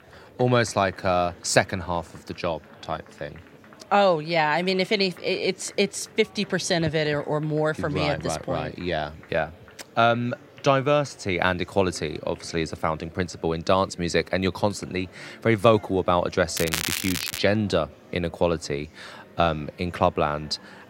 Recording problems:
crackling; loud; at 17 s; 4 dB below the speech
murmuring crowd; faint; throughout; 25 dB below the speech

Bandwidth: 16 kHz